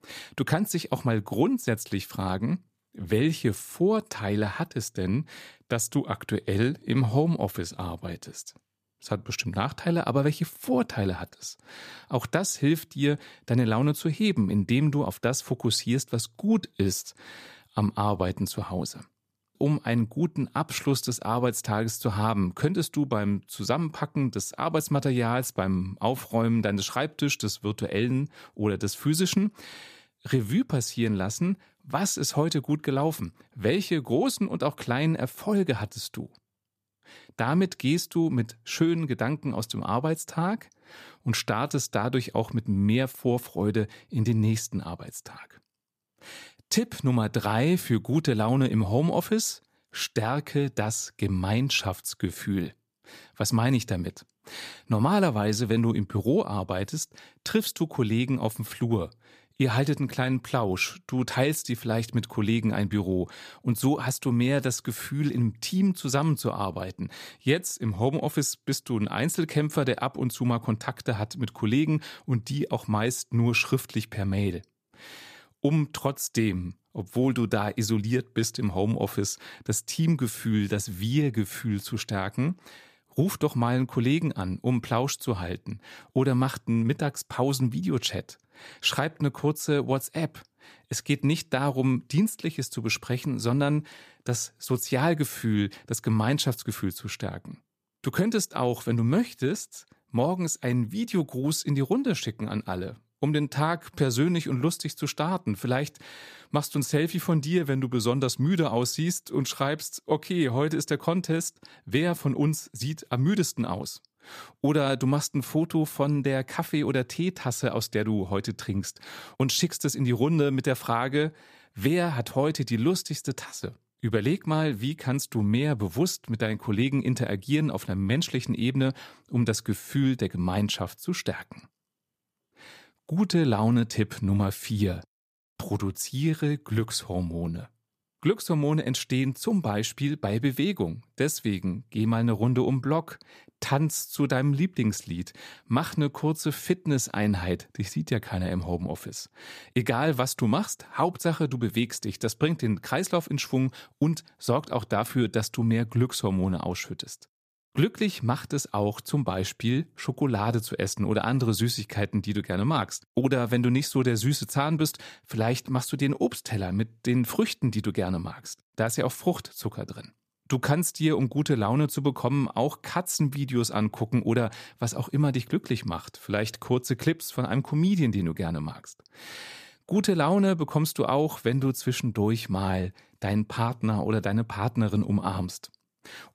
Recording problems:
none

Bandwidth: 14.5 kHz